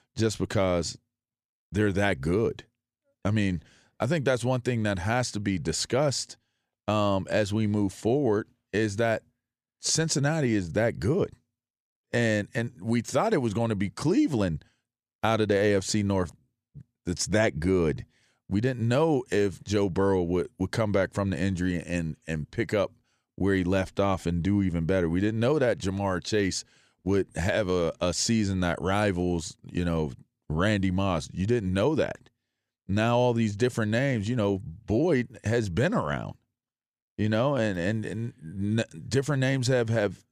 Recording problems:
none

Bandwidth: 14.5 kHz